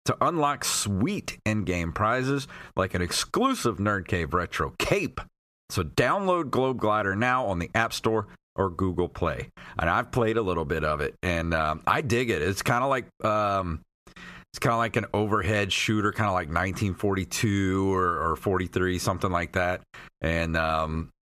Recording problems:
squashed, flat; somewhat

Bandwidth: 14.5 kHz